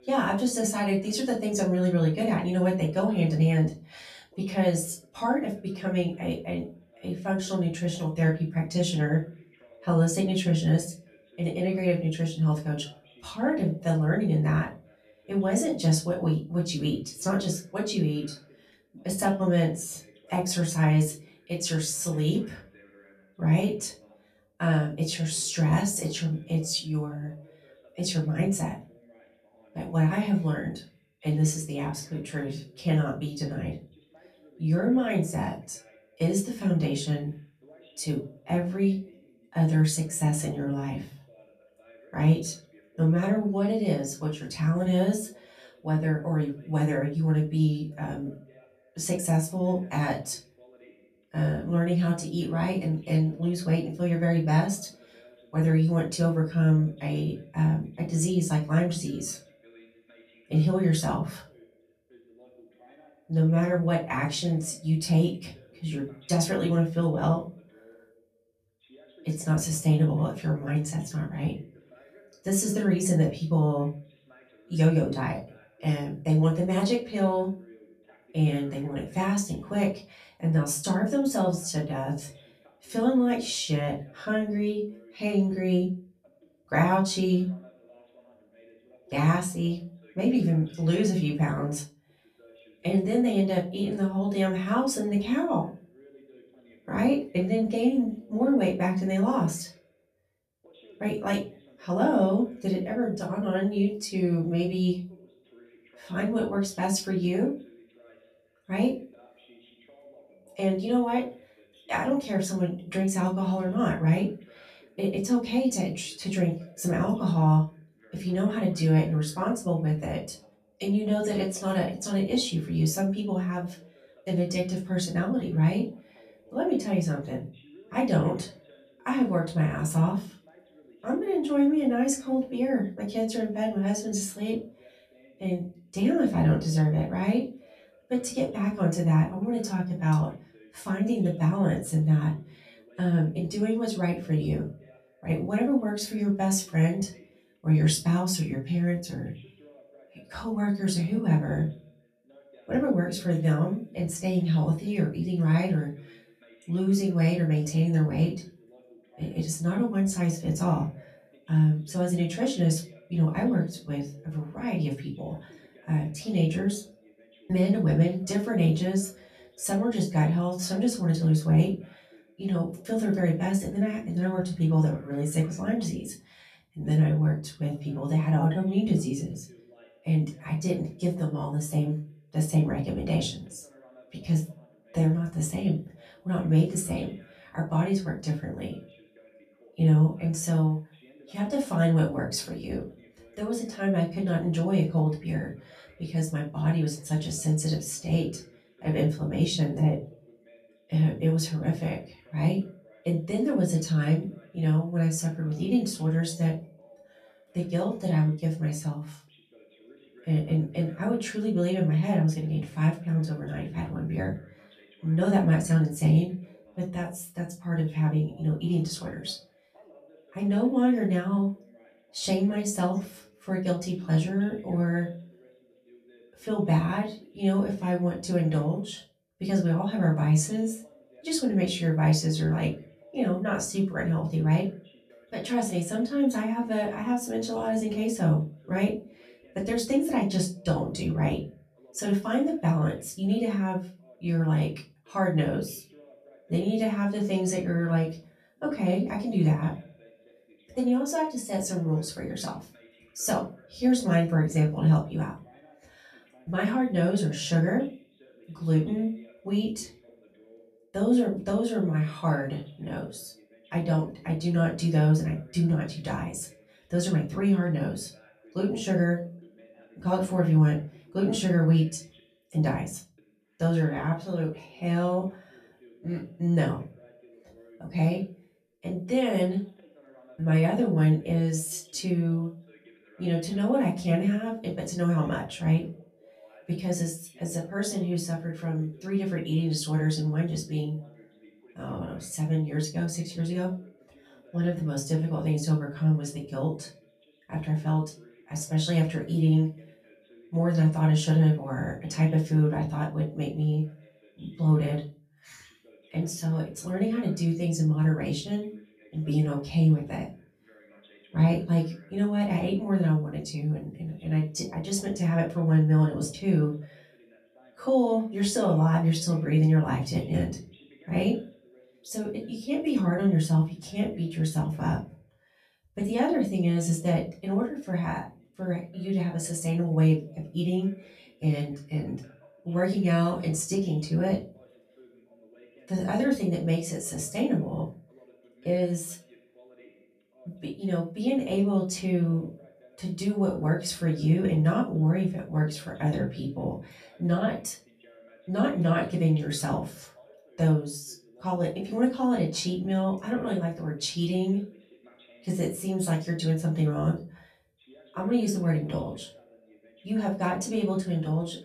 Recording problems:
off-mic speech; far
room echo; slight; dies away in 0.3 s
voice in the background; faint; throughout; 30 dB below the speech

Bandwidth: 14.5 kHz